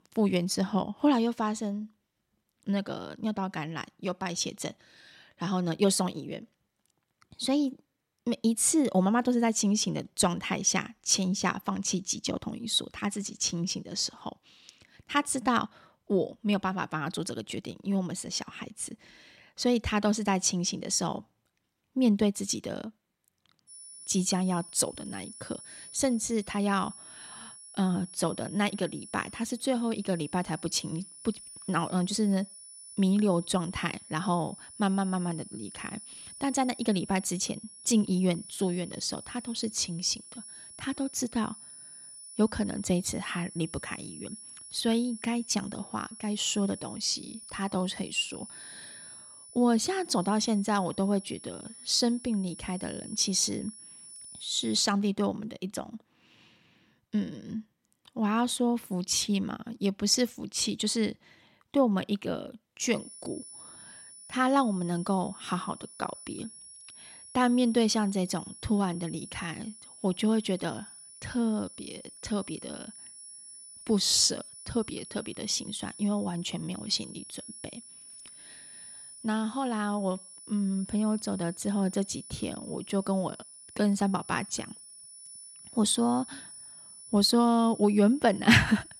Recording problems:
high-pitched whine; noticeable; from 24 to 55 s and from 1:03 on; 10 kHz, 15 dB below the speech

